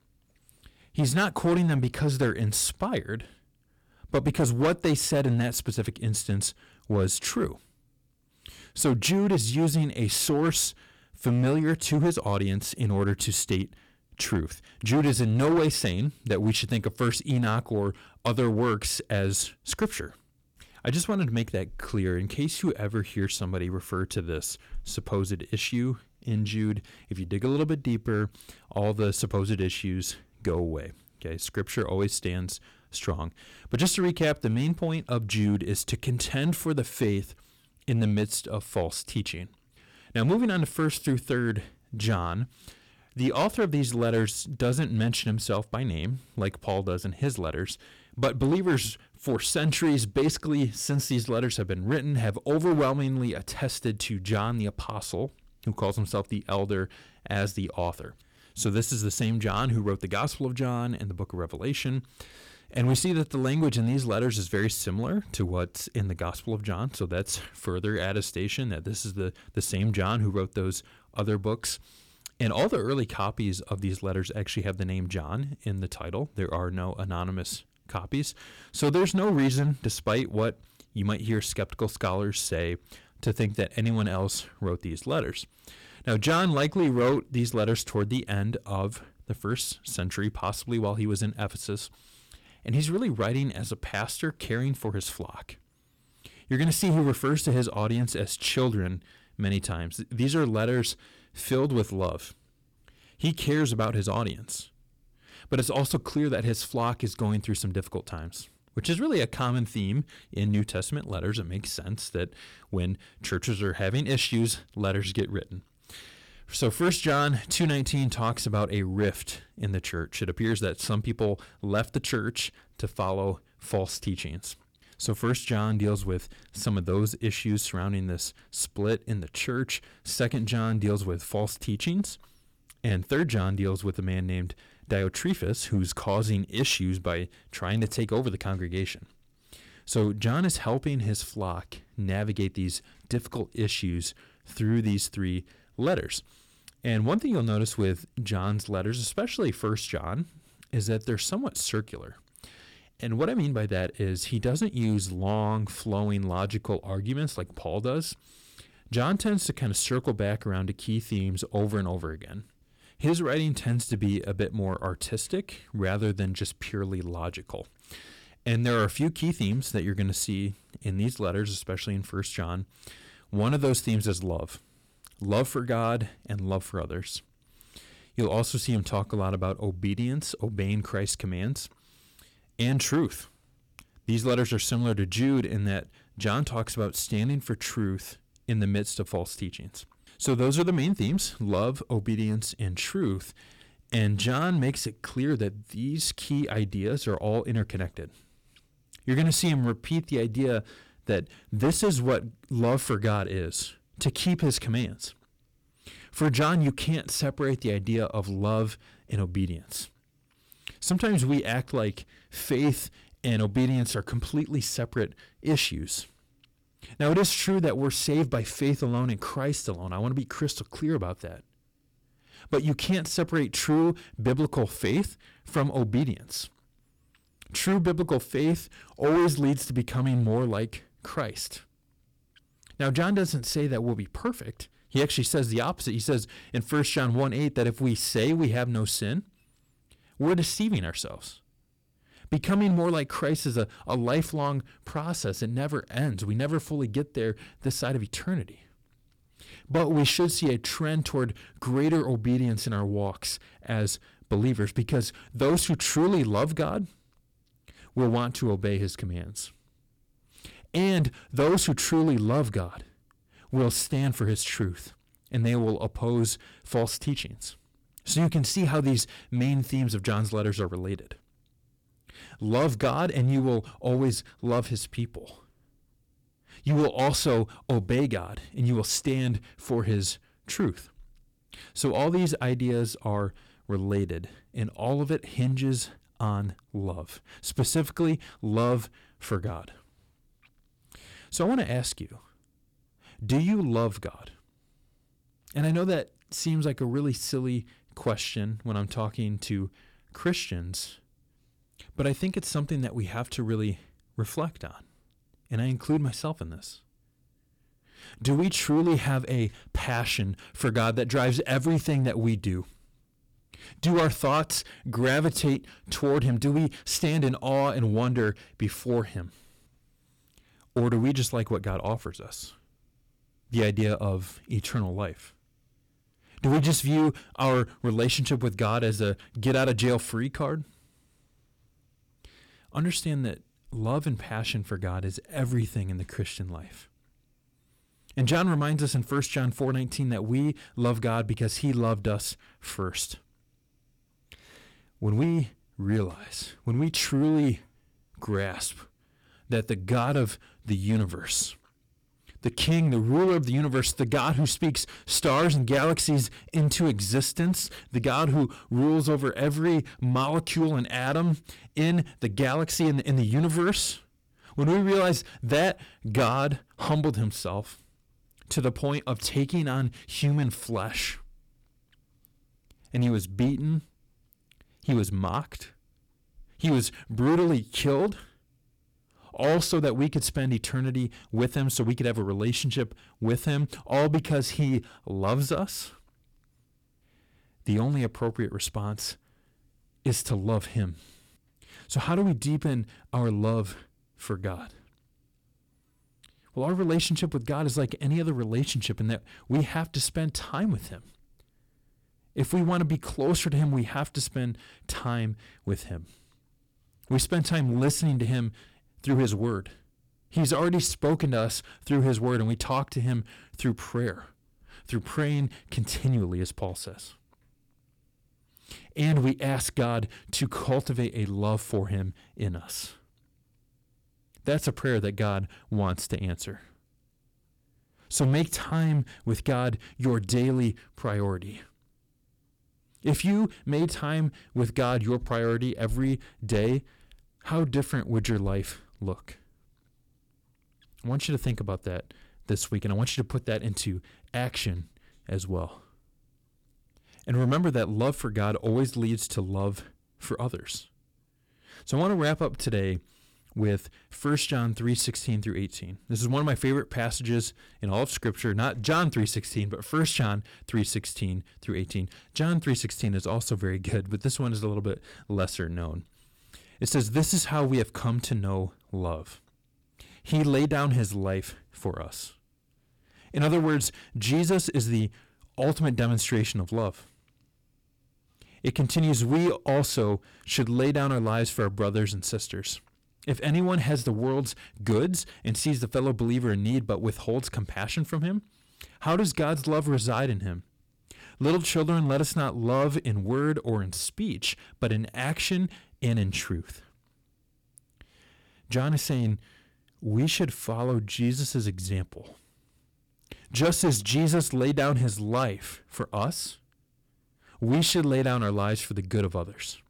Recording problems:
distortion; slight; 5% of the sound clipped

